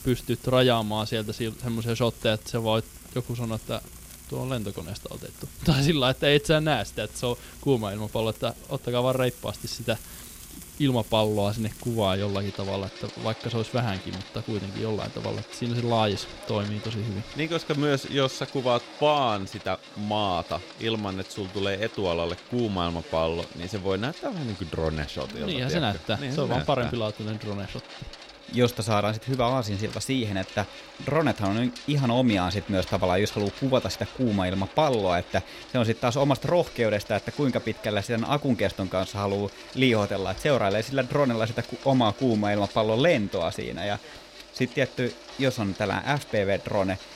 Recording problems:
household noises; noticeable; throughout; 15 dB below the speech

